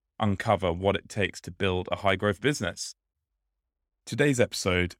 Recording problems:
none

